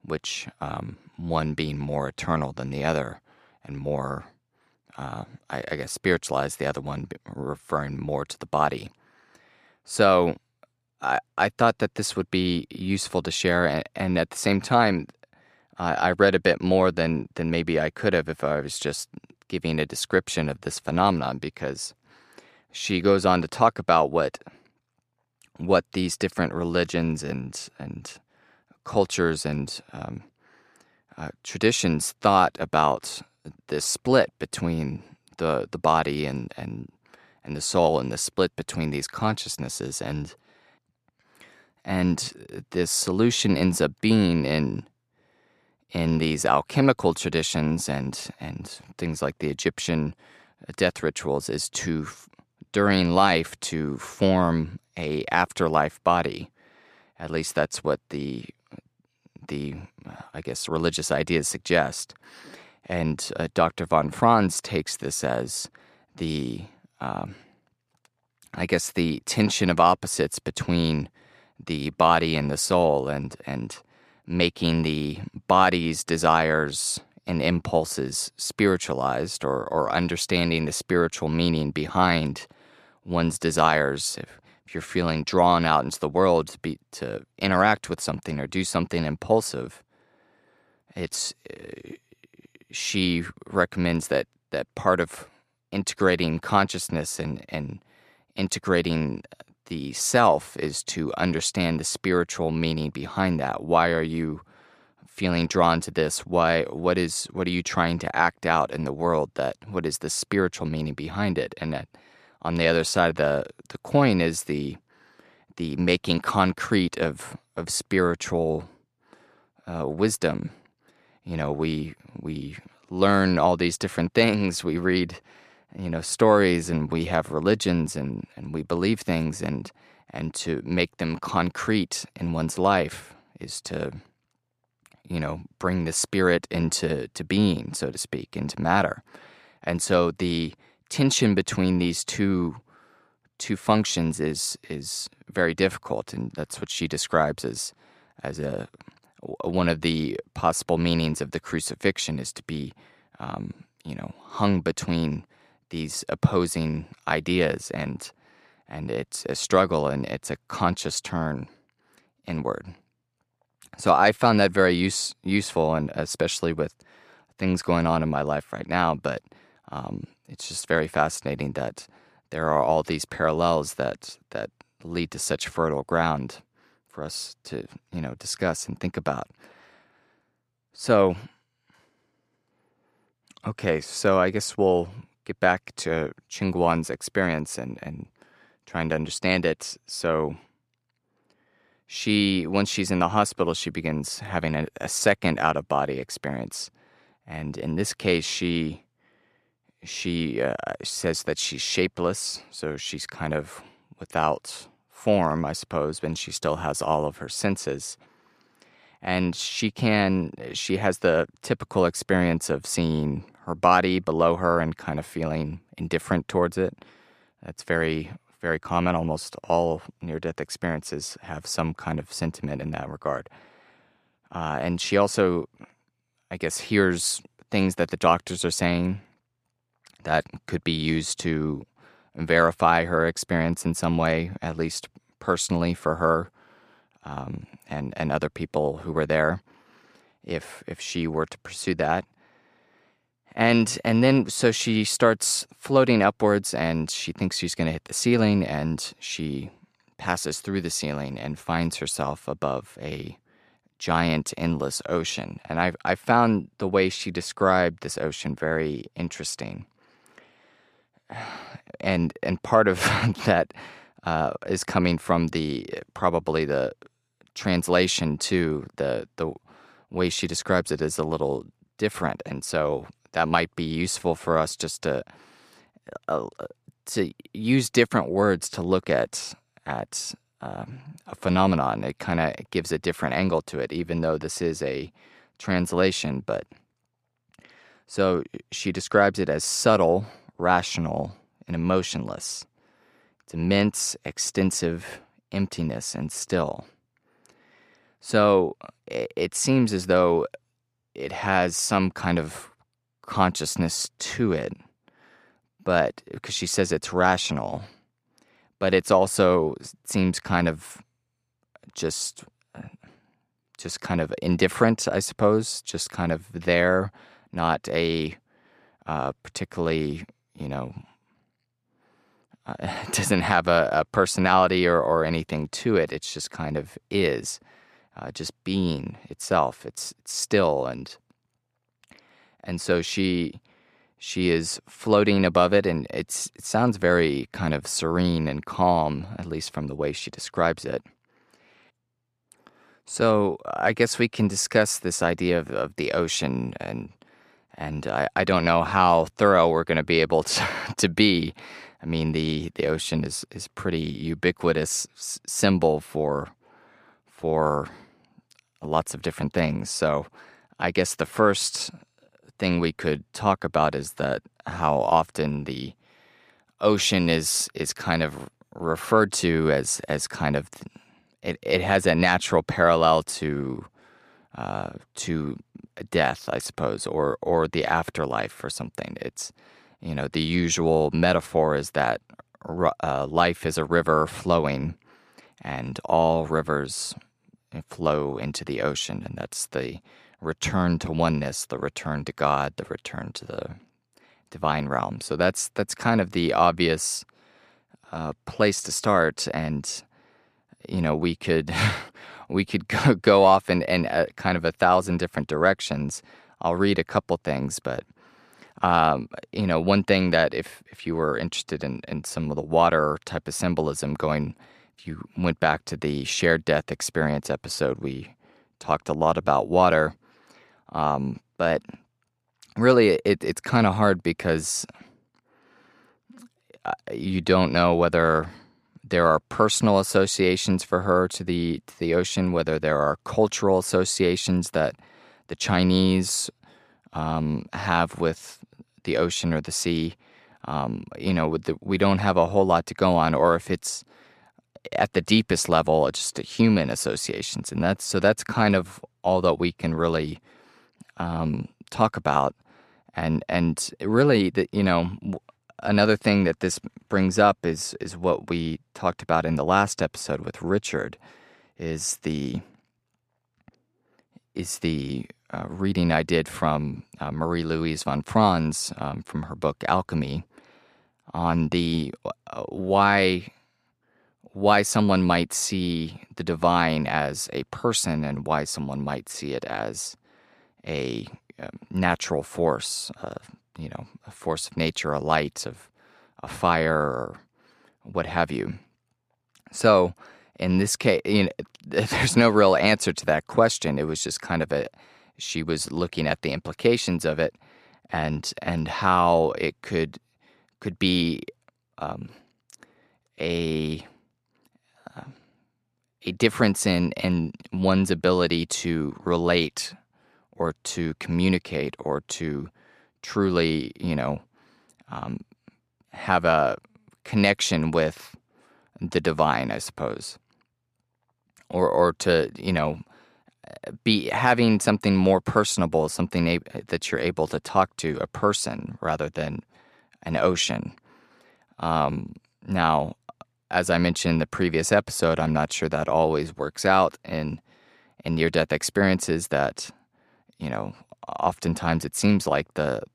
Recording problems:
none

